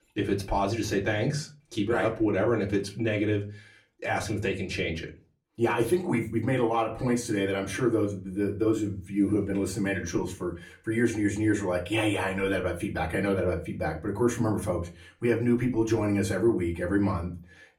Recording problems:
off-mic speech; far
room echo; very slight; dies away in 0.3 s

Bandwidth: 17 kHz